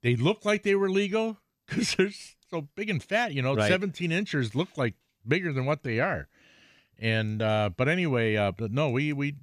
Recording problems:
none

